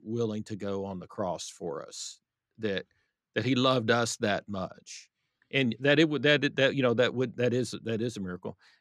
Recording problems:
none

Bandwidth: 14 kHz